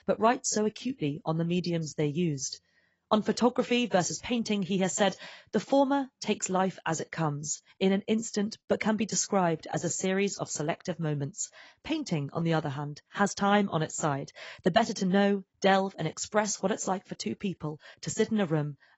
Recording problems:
garbled, watery; badly; nothing above 7.5 kHz

